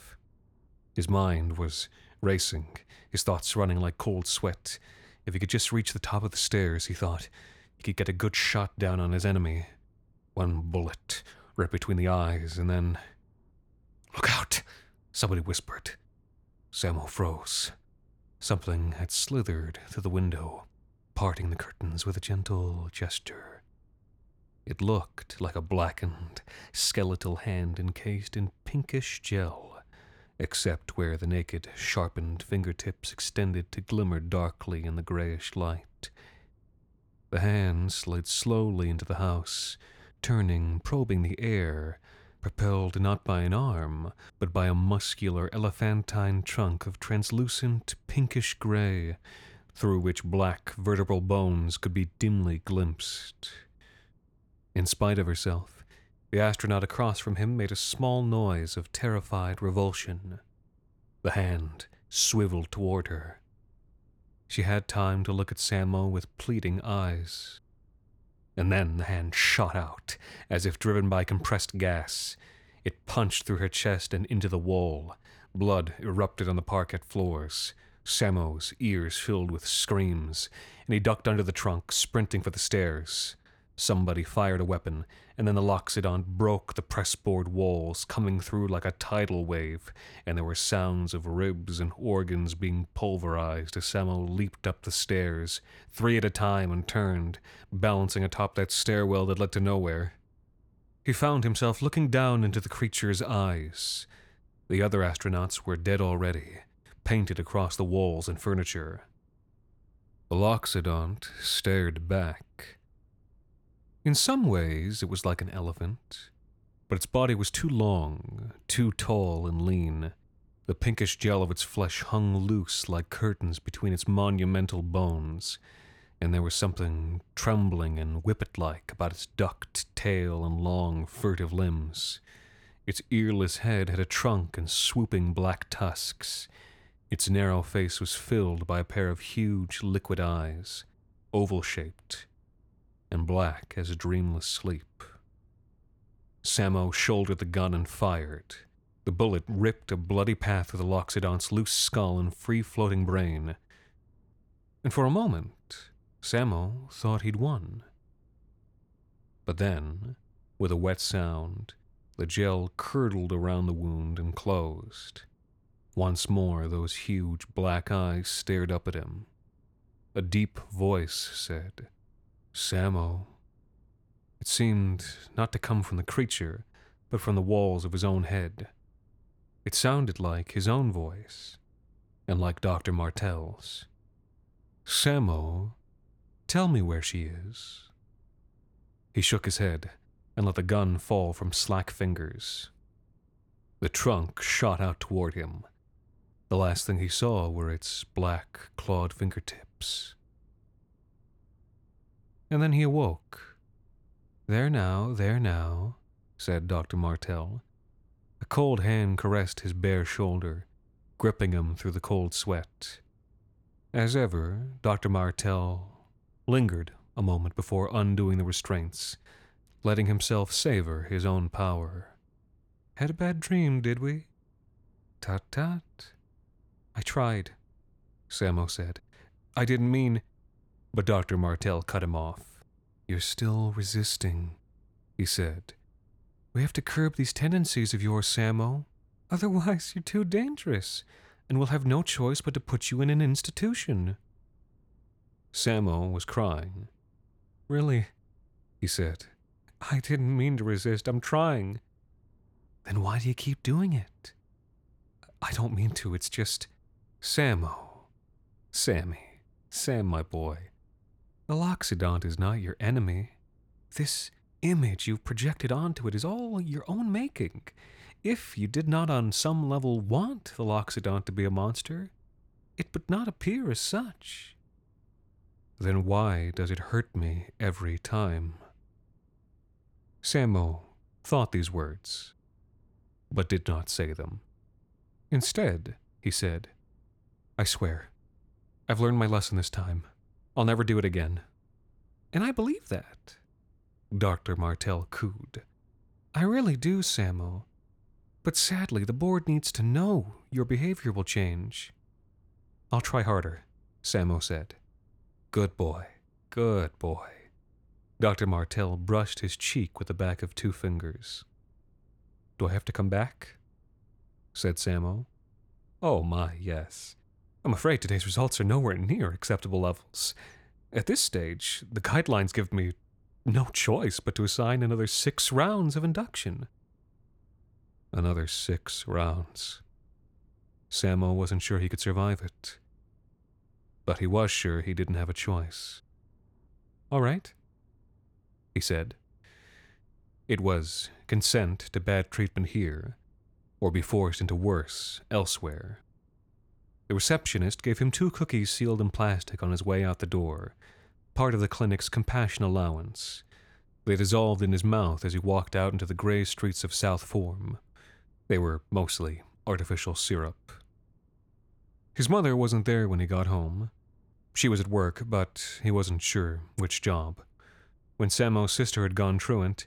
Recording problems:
none

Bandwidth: 18.5 kHz